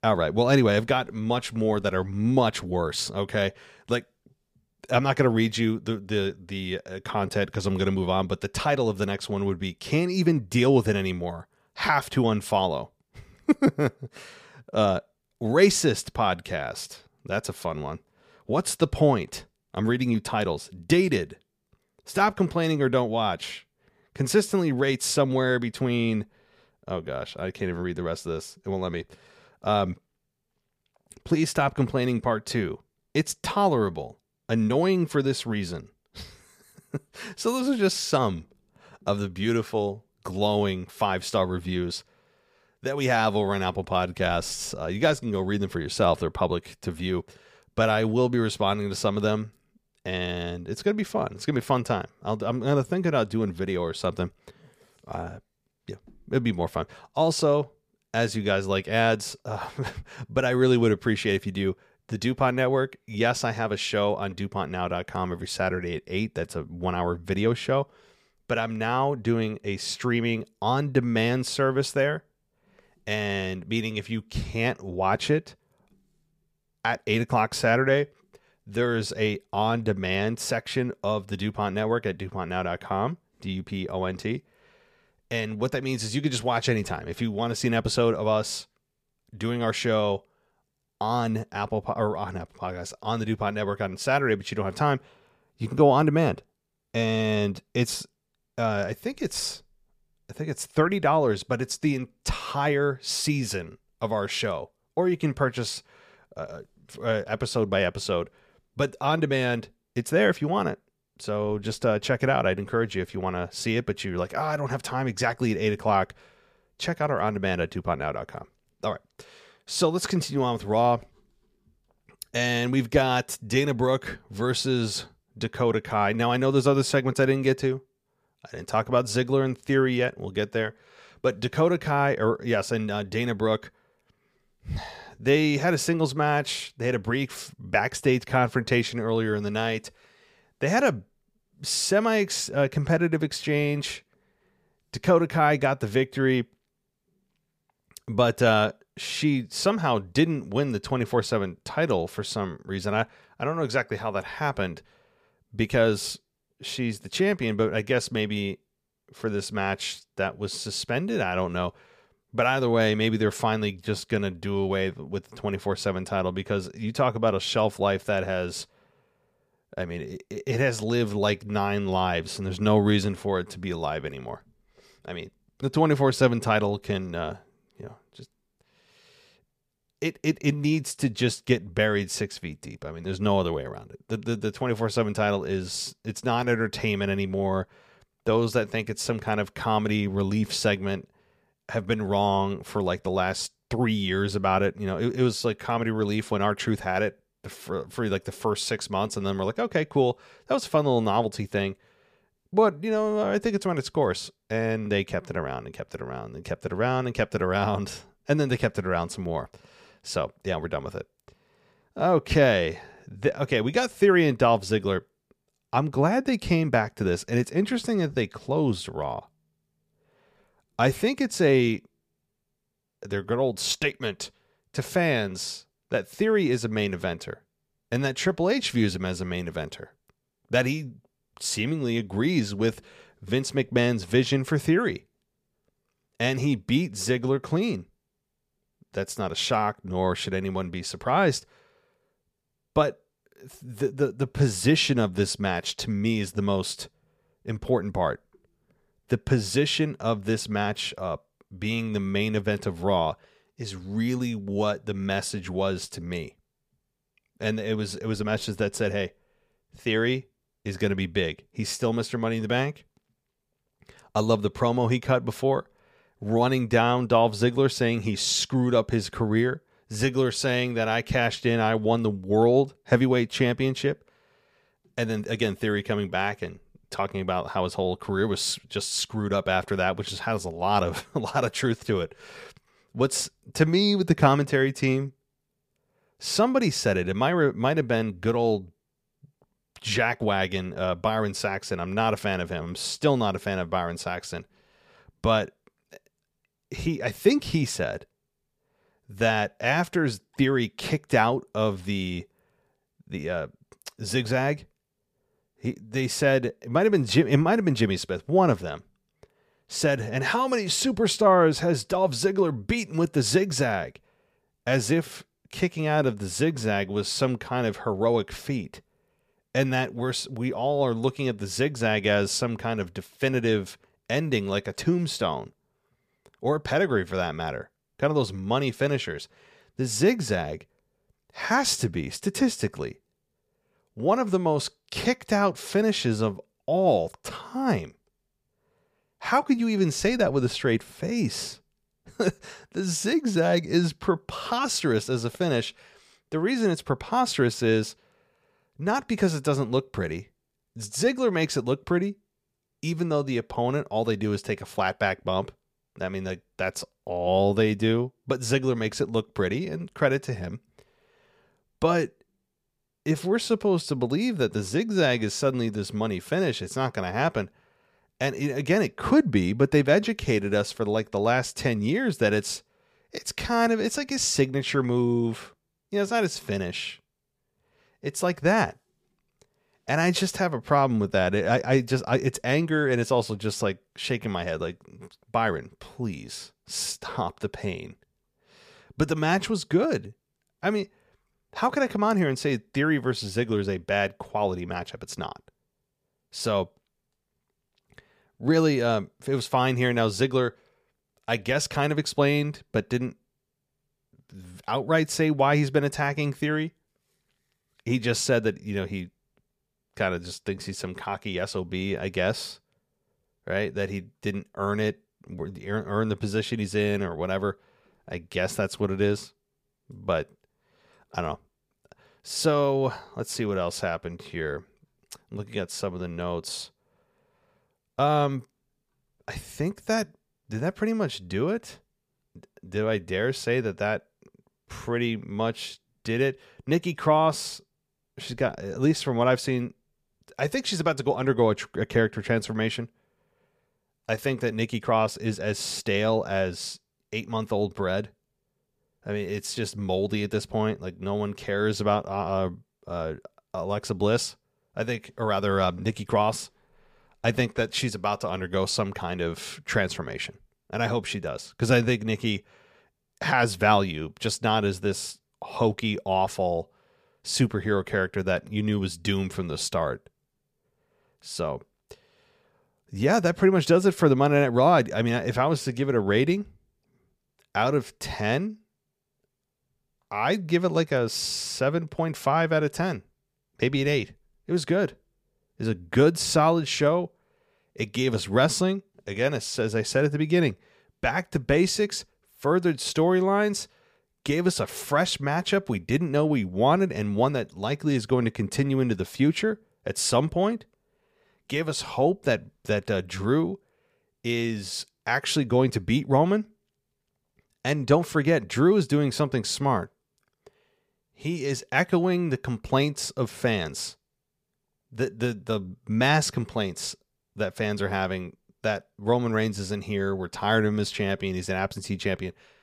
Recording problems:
none

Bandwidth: 15 kHz